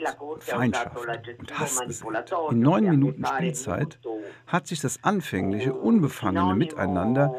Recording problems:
voice in the background; loud; throughout; 7 dB below the speech

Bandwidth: 14 kHz